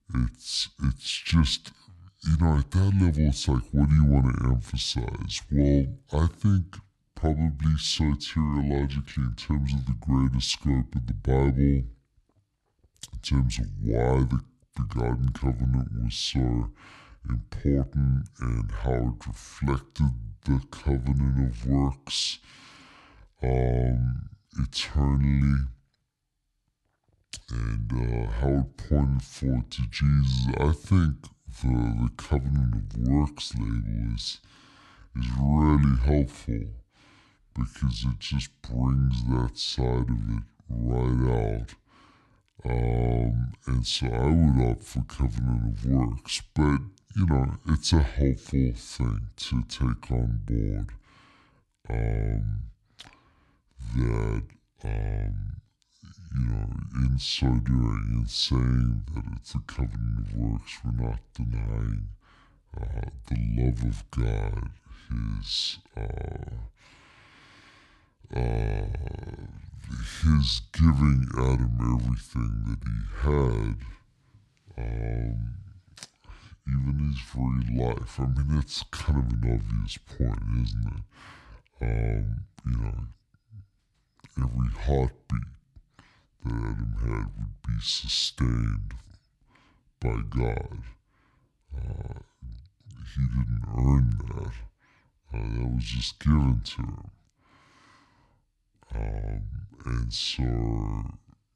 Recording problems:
wrong speed and pitch; too slow and too low; 0.6 times normal speed

